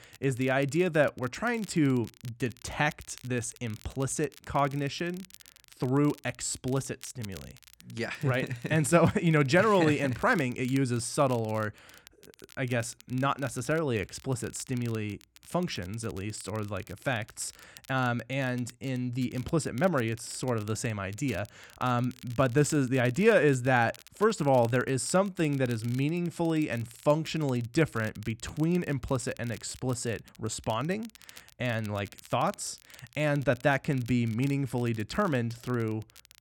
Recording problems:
crackle, like an old record; faint; 25 dB below the speech

